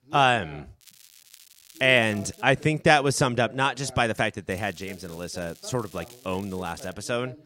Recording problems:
voice in the background; faint; throughout; 25 dB below the speech
crackling; faint; from 1 to 2.5 s and from 4.5 to 7 s; 25 dB below the speech

